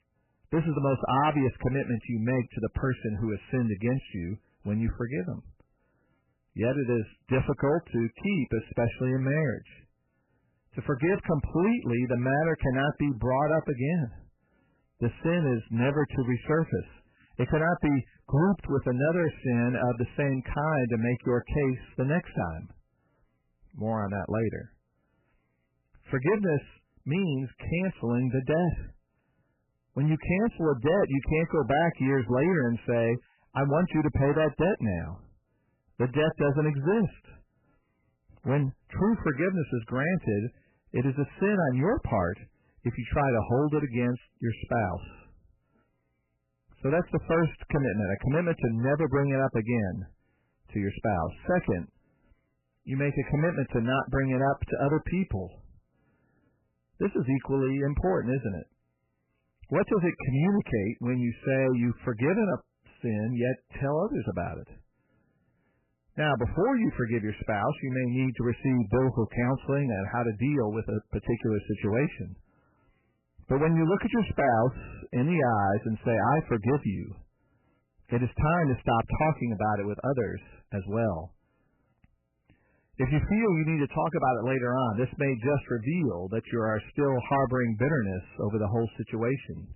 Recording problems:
garbled, watery; badly; nothing above 3 kHz
distortion; slight; 7% of the sound clipped

